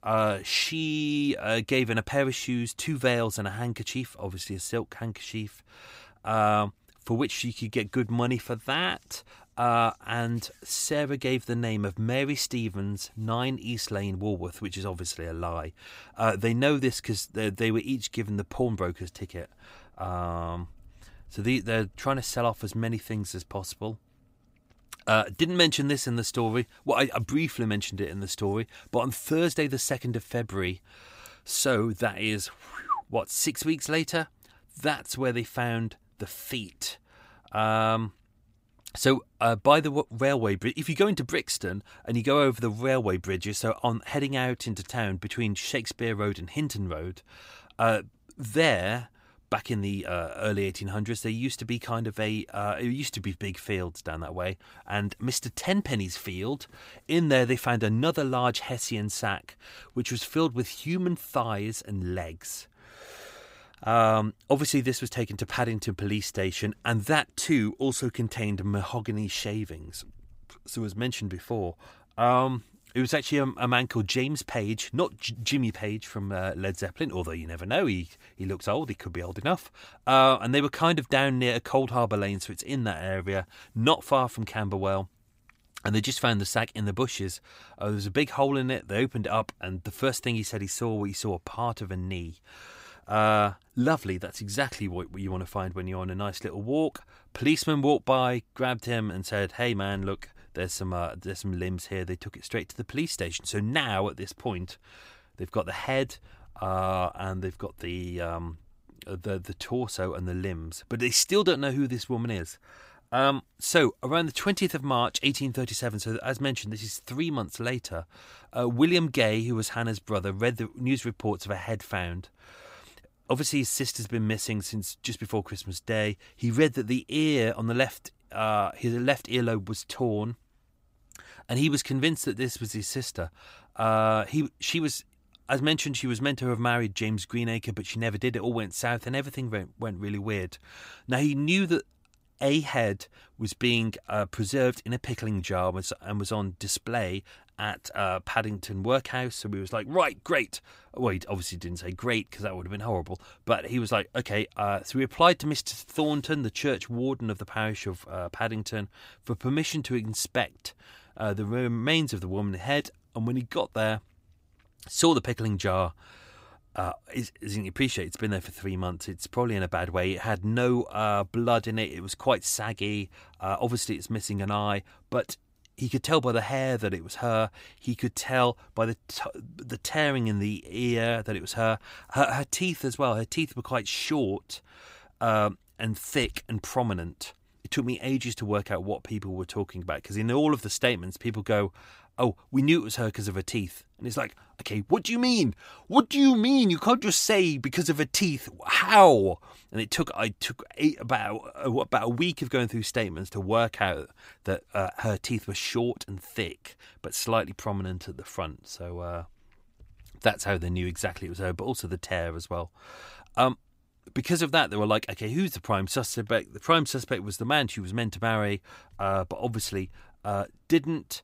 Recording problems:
none

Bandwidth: 15.5 kHz